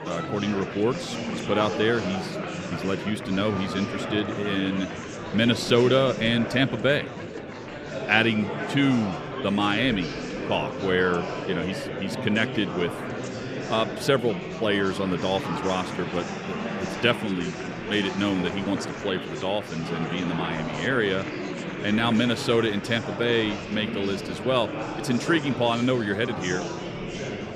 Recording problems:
murmuring crowd; loud; throughout; 6 dB below the speech

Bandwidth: 15 kHz